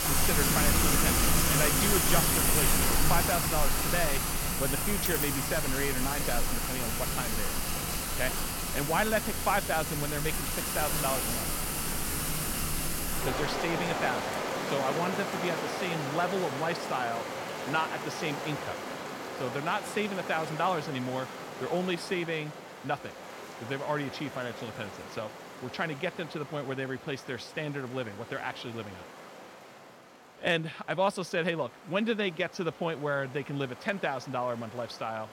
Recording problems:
rain or running water; very loud; throughout; 3 dB above the speech

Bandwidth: 16.5 kHz